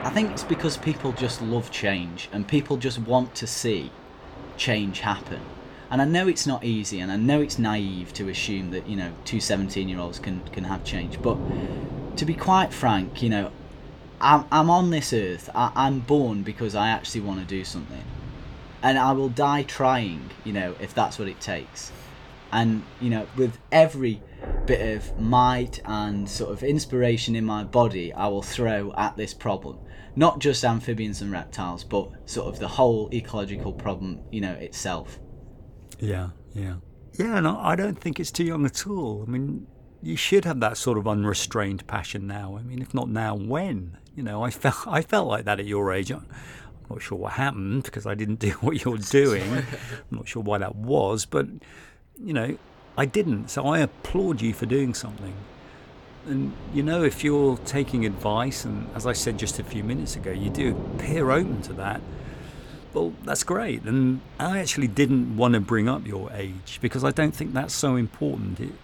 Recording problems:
rain or running water; noticeable; throughout; 15 dB below the speech

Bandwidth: 18.5 kHz